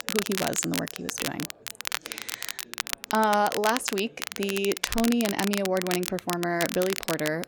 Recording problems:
crackle, like an old record; loud; 5 dB below the speech
chatter from many people; faint; throughout; 25 dB below the speech

